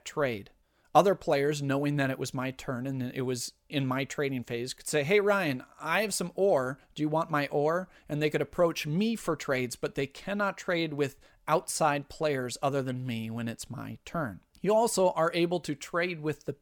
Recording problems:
none

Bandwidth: 18 kHz